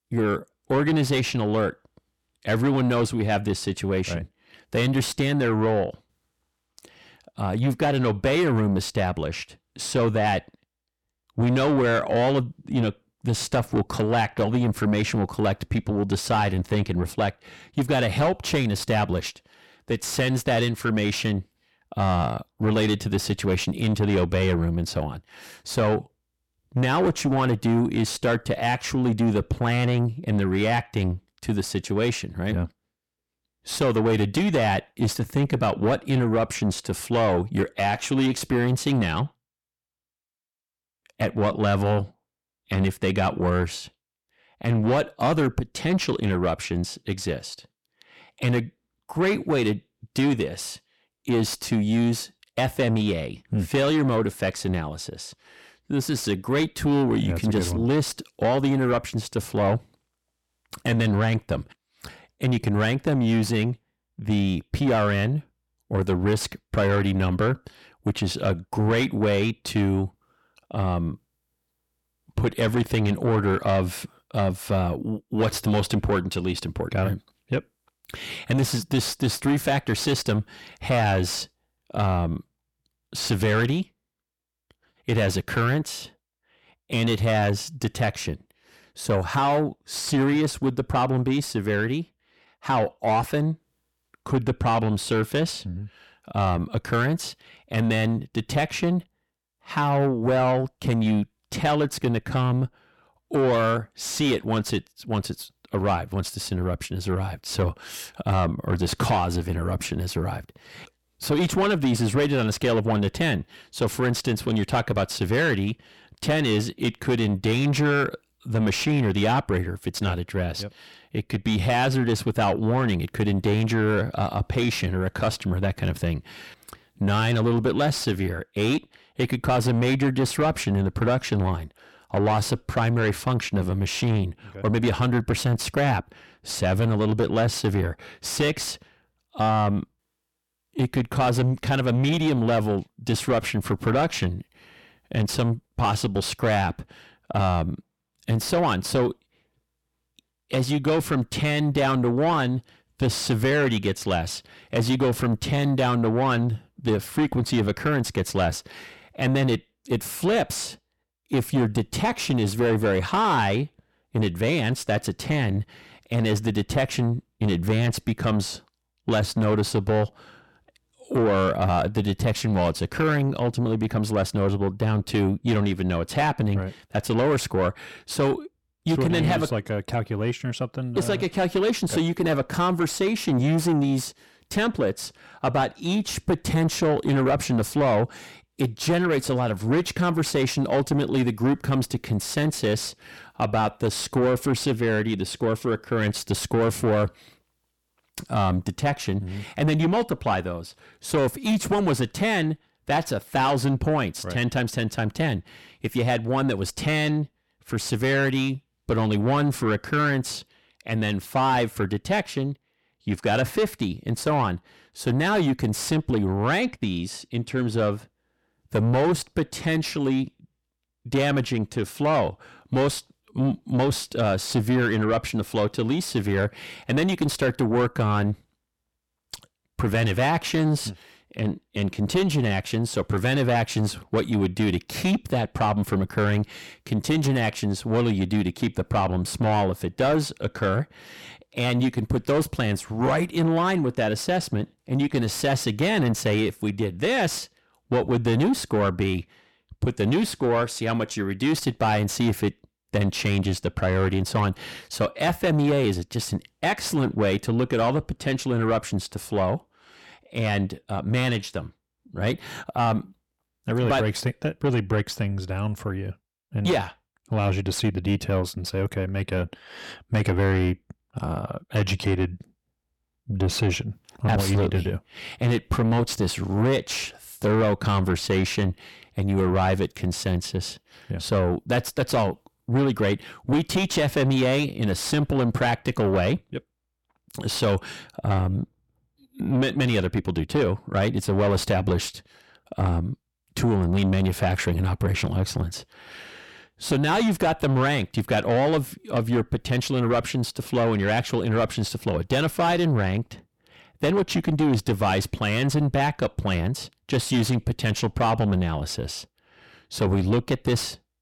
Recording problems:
distortion; heavy; 7 dB below the speech

